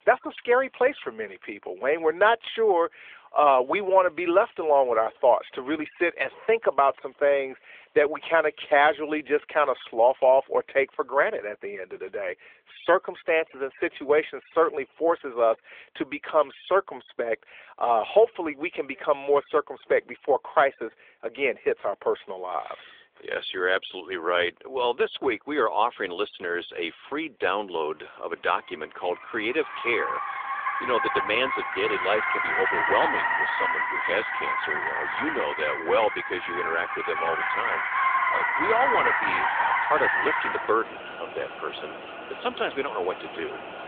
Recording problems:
phone-call audio; nothing above 3.5 kHz
traffic noise; loud; throughout; 1 dB below the speech

